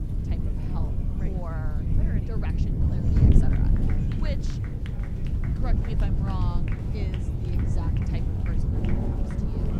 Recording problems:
rain or running water; very loud; throughout; 2 dB above the speech
wind noise on the microphone; heavy; 4 dB above the speech
chatter from many people; loud; throughout; 4 dB below the speech

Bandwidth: 16.5 kHz